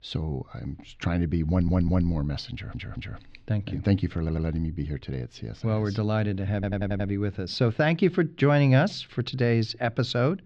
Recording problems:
muffled; slightly; fading above 4 kHz
audio stuttering; 4 times, first at 1.5 s

